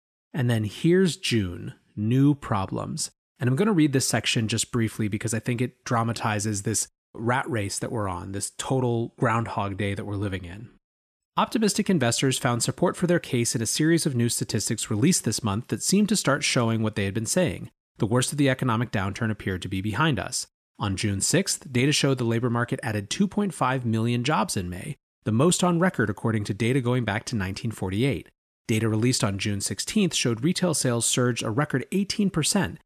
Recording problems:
none

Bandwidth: 14.5 kHz